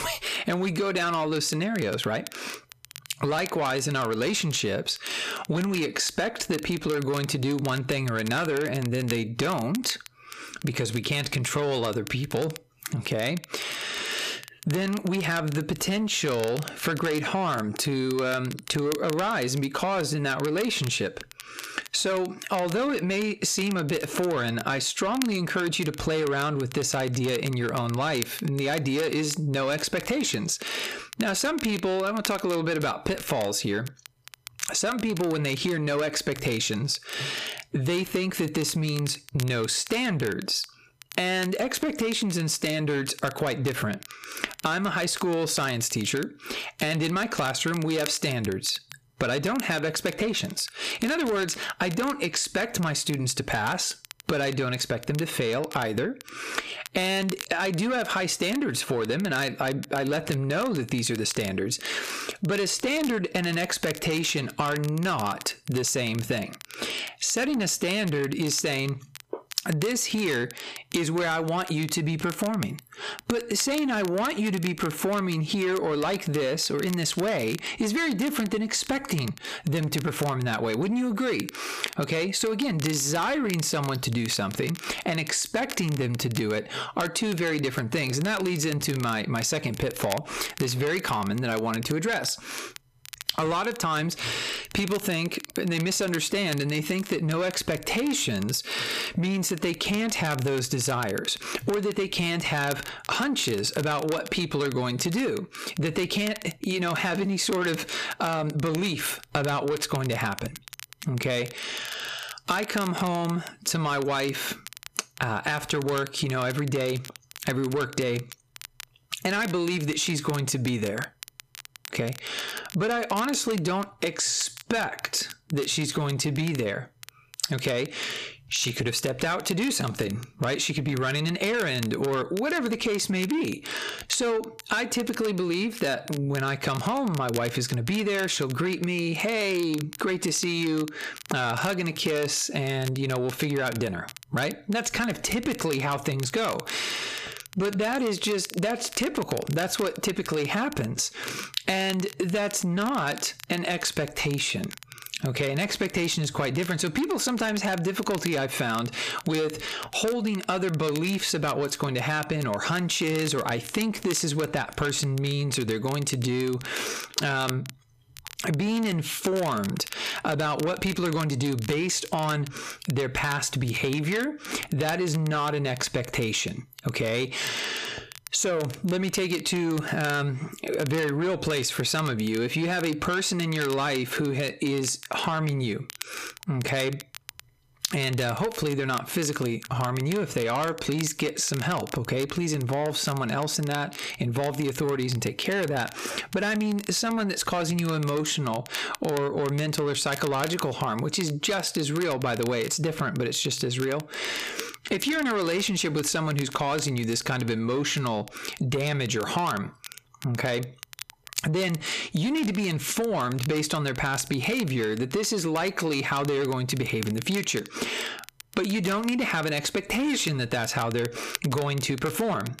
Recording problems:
squashed, flat; heavily
distortion; slight; 10 dB below the speech
crackle, like an old record; noticeable; 15 dB below the speech

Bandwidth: 14.5 kHz